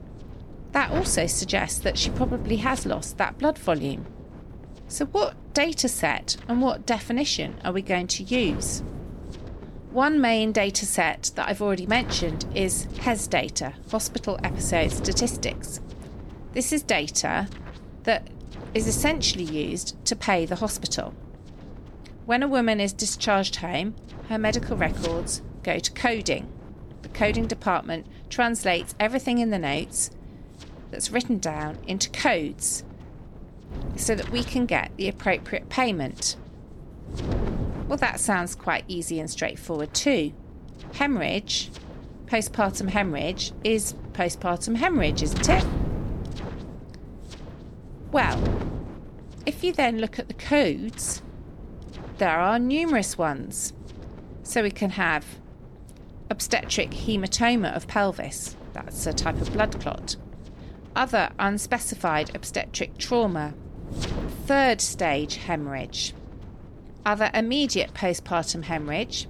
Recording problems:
wind noise on the microphone; occasional gusts; 15 dB below the speech

